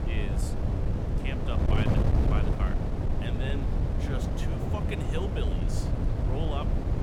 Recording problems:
wind noise on the microphone; heavy; 2 dB above the speech

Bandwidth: 18 kHz